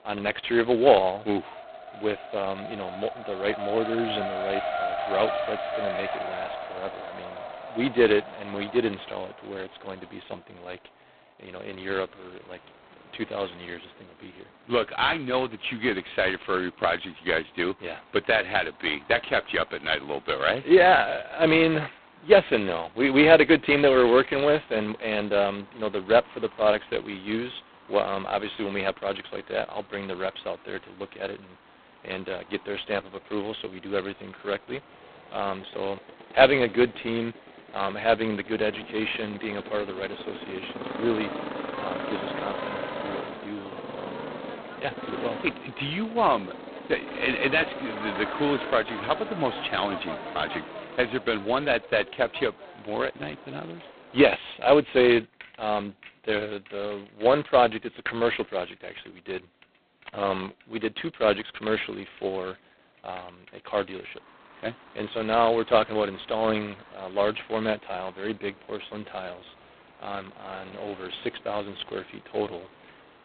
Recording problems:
phone-call audio; poor line; nothing above 4 kHz
traffic noise; noticeable; throughout; 10 dB below the speech

